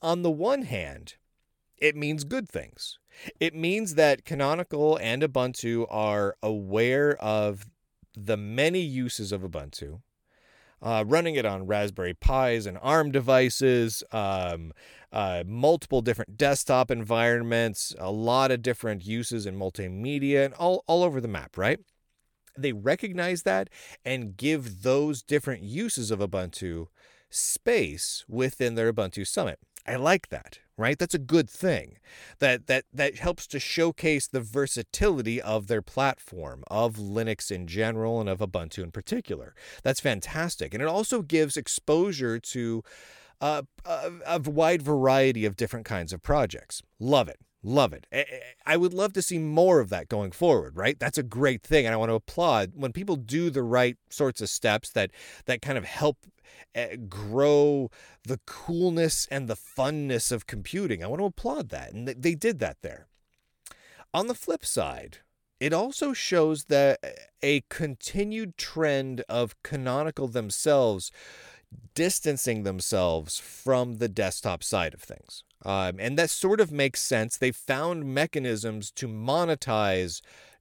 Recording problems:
none

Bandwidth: 18 kHz